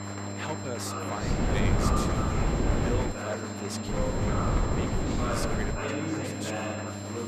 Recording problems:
chatter from many people; very loud; throughout; 4 dB above the speech
wind noise on the microphone; heavy; from 1 to 3 s and from 4 to 6 s; 4 dB above the speech
electrical hum; loud; until 2 s, from 3 to 4.5 s and from 6 s on; 50 Hz, 6 dB below the speech
high-pitched whine; loud; throughout; 7.5 kHz, 5 dB below the speech

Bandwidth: 14.5 kHz